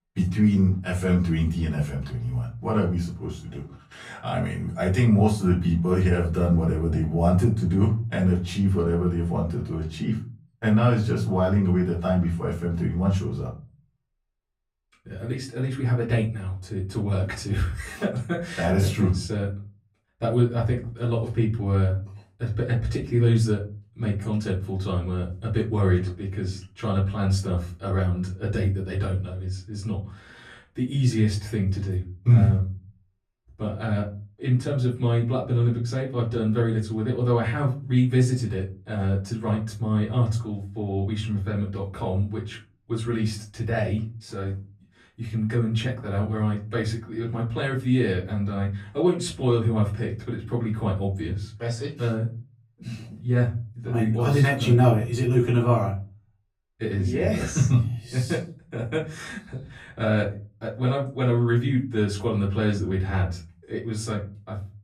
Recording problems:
off-mic speech; far
room echo; slight; dies away in 0.4 s

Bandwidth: 15.5 kHz